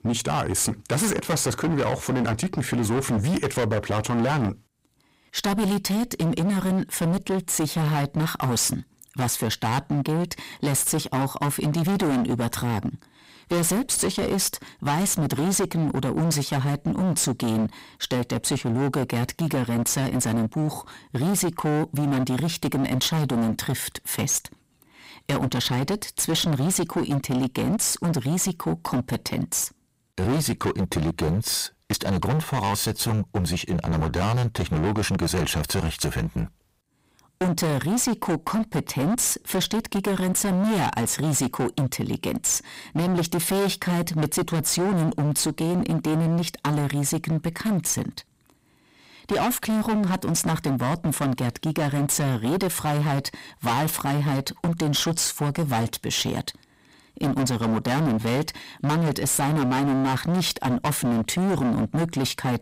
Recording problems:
distortion; heavy; 28% of the sound clipped

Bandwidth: 15.5 kHz